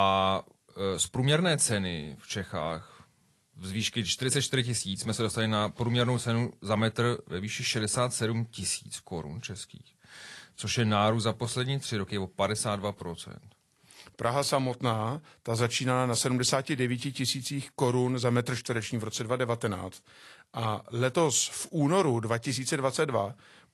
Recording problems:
garbled, watery; slightly
abrupt cut into speech; at the start

